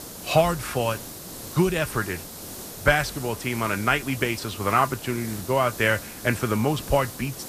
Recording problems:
hiss; noticeable; throughout; 10 dB below the speech

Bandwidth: 14.5 kHz